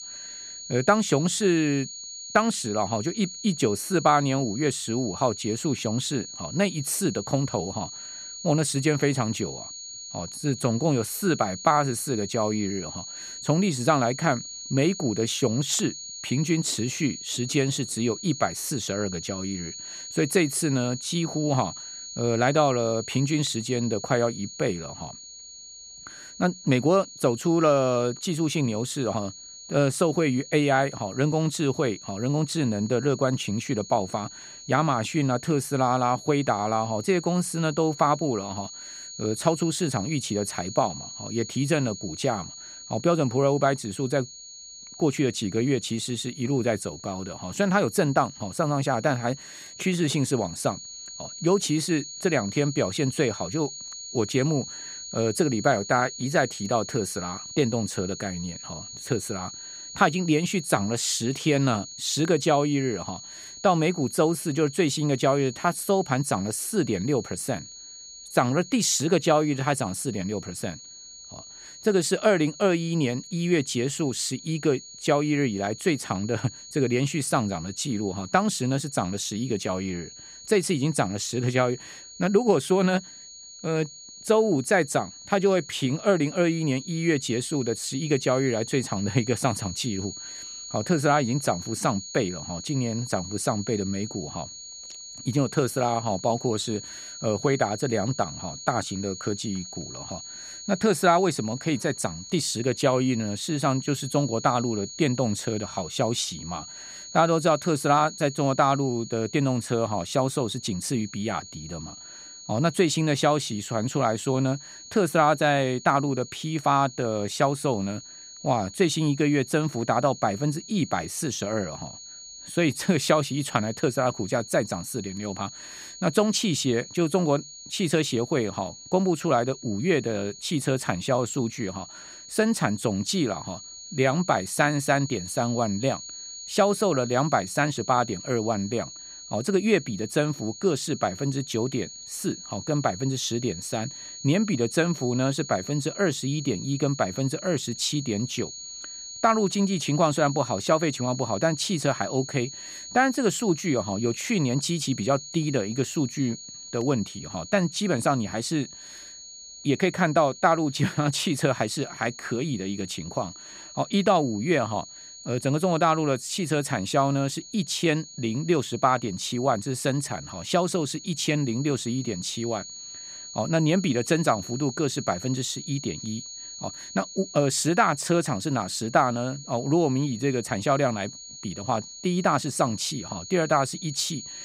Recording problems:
high-pitched whine; noticeable; throughout; 6.5 kHz, 15 dB below the speech

